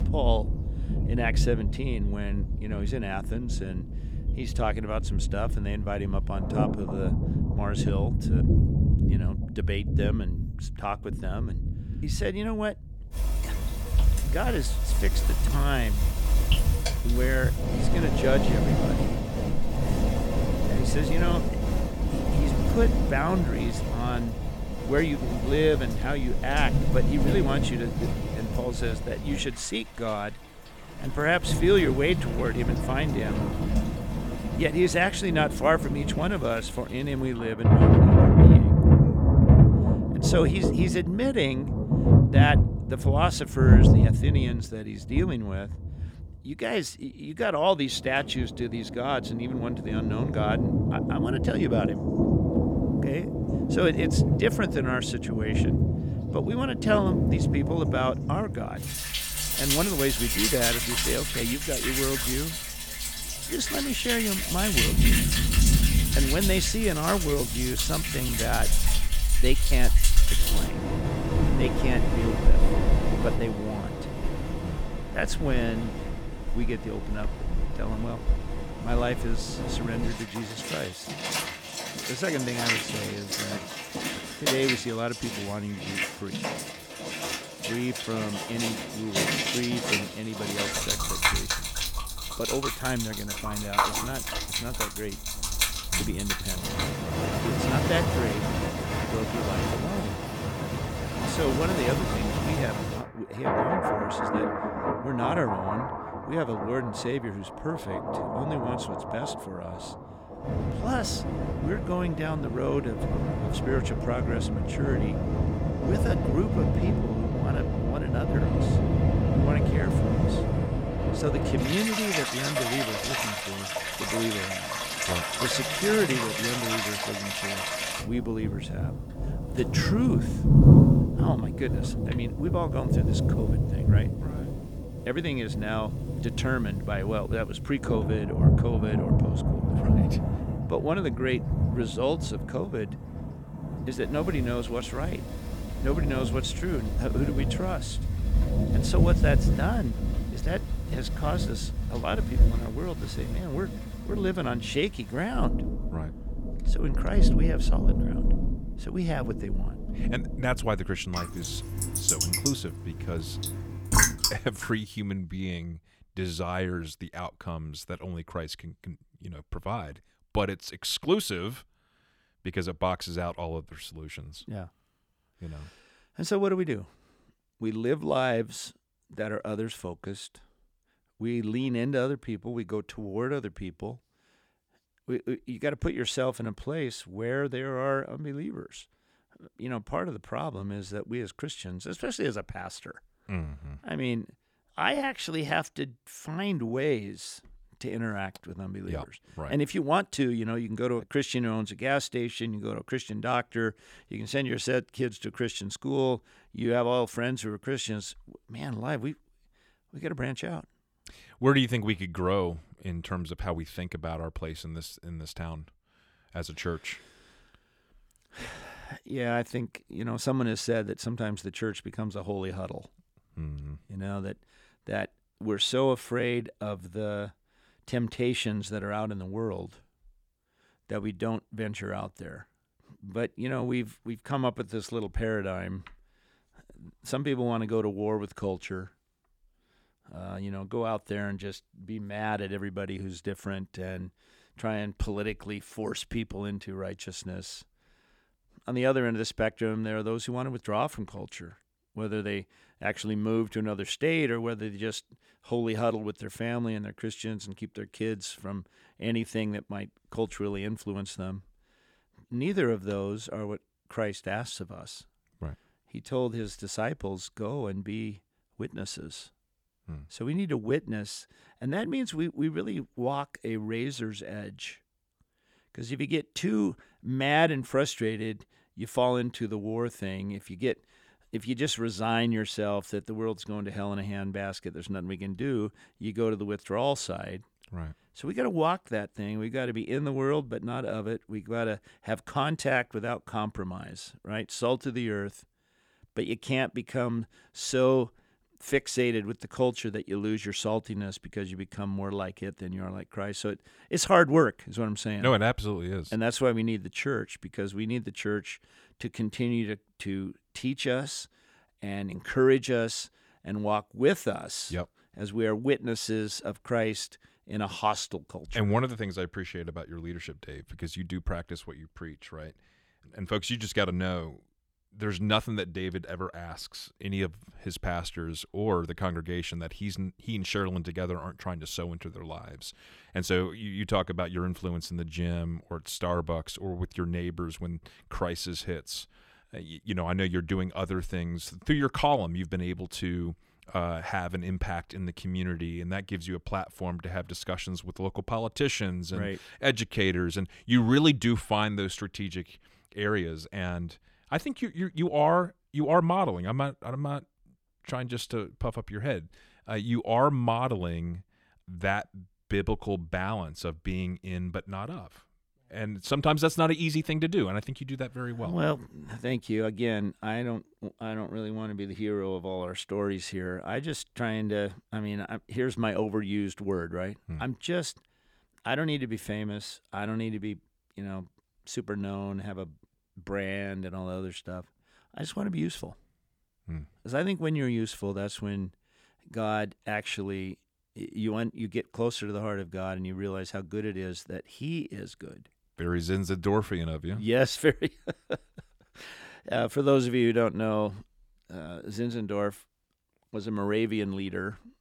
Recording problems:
rain or running water; very loud; until 2:44; 4 dB above the speech

